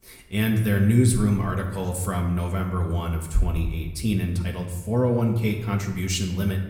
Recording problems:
room echo; slight; dies away in 0.8 s
off-mic speech; somewhat distant

